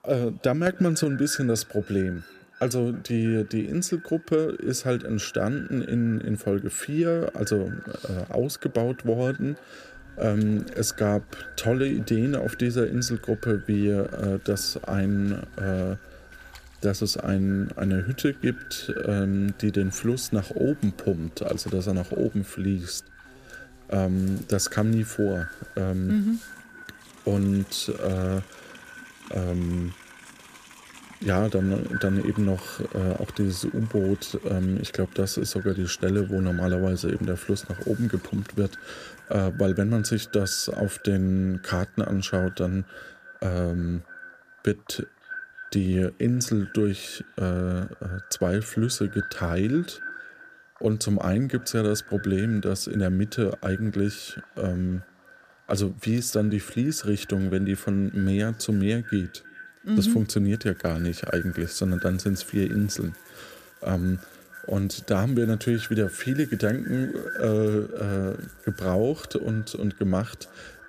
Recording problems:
echo of what is said; noticeable; throughout; 320 ms later, 15 dB below the speech
animal sounds; faint; throughout; 25 dB below the speech

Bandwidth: 14.5 kHz